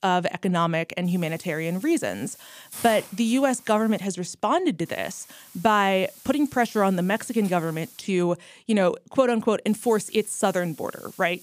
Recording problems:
hiss; noticeable; from 1 to 4 s, from 5 to 8 s and from 9.5 s on; 20 dB below the speech

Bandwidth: 15 kHz